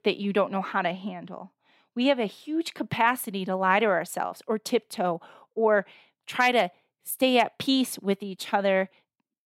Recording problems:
none

